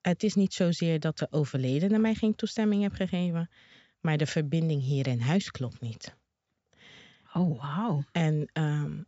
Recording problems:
high frequencies cut off; noticeable; nothing above 8 kHz

